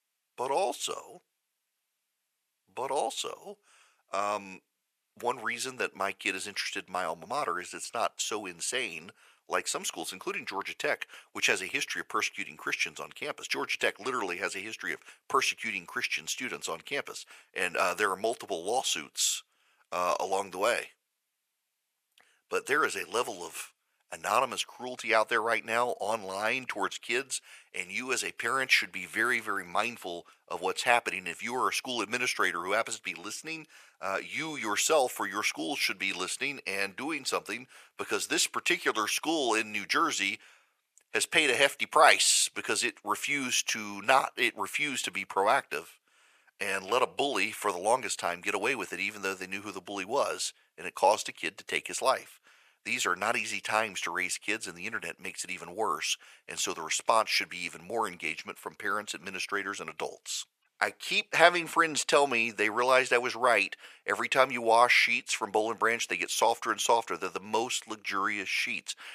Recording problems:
thin; very; fading below 700 Hz

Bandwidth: 14.5 kHz